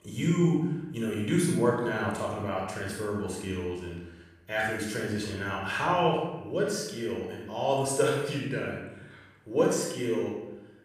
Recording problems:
off-mic speech; far
room echo; noticeable; dies away in 0.9 s

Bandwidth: 15 kHz